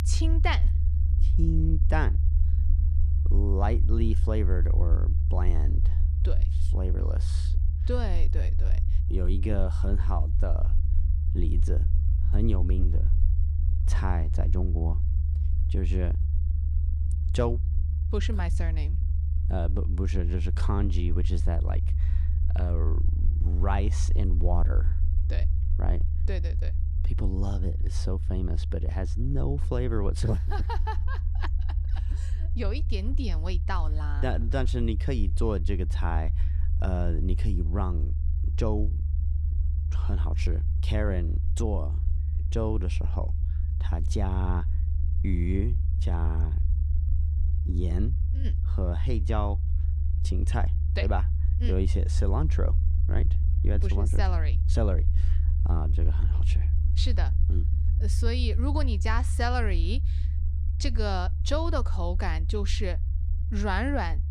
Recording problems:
low rumble; loud; throughout; 10 dB below the speech

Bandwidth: 15 kHz